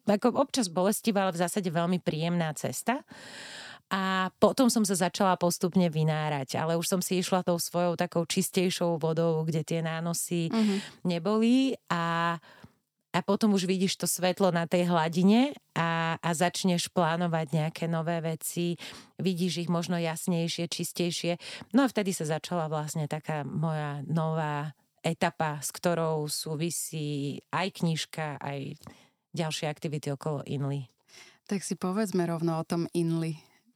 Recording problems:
none

